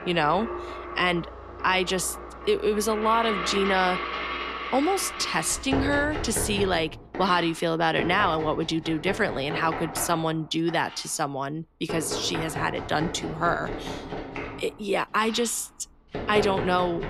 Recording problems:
household noises; loud; throughout; 8 dB below the speech

